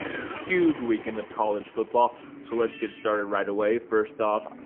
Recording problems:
phone-call audio; poor line; nothing above 3.5 kHz
traffic noise; noticeable; throughout; 15 dB below the speech

